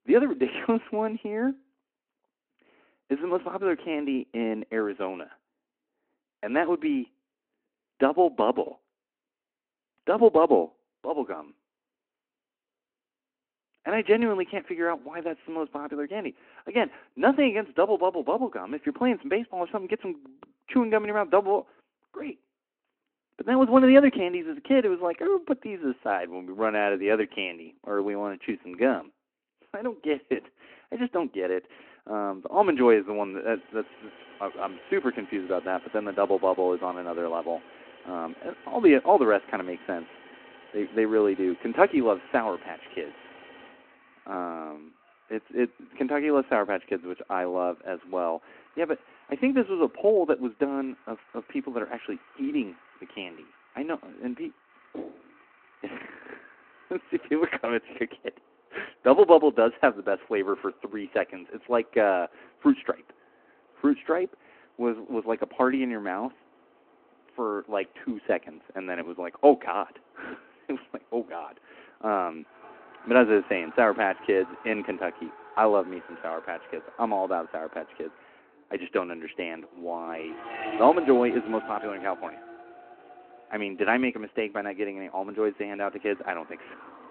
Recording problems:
phone-call audio
traffic noise; noticeable; from 33 s on; 20 dB below the speech
door banging; faint; at 55 s; peak 15 dB below the speech

